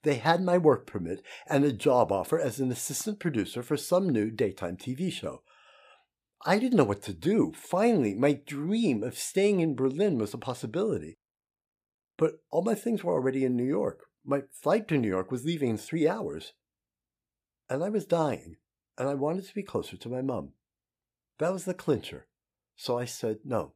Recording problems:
none

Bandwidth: 15 kHz